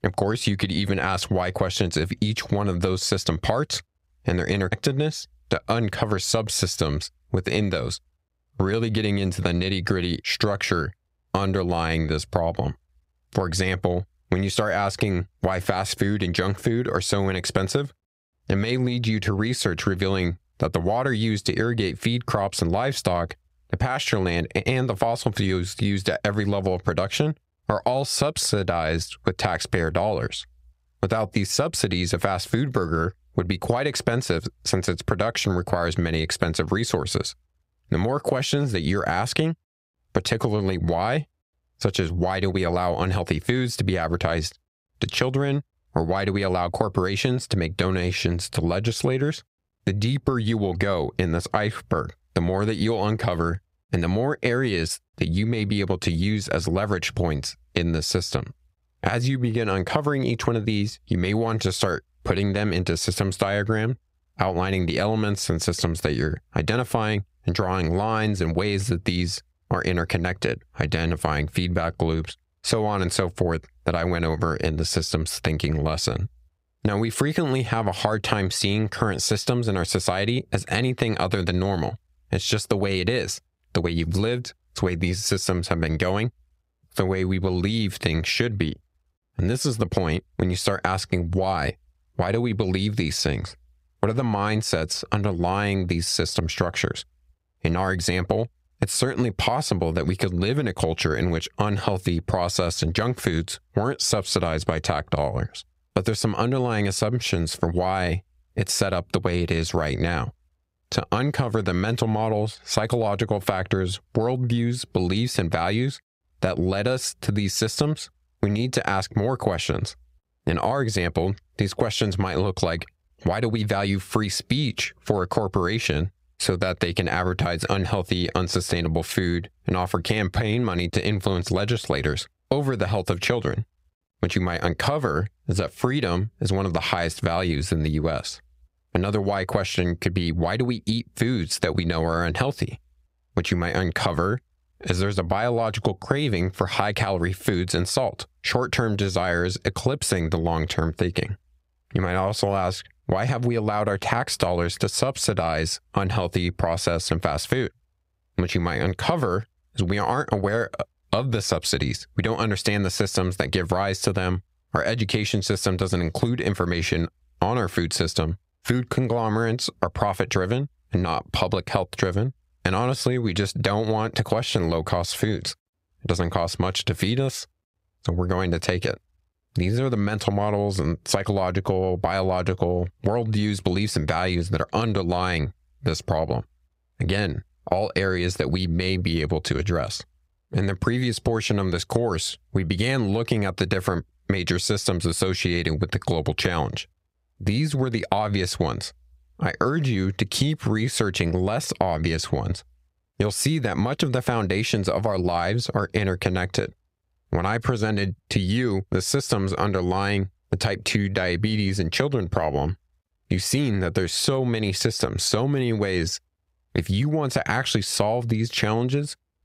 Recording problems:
squashed, flat; somewhat

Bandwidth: 15.5 kHz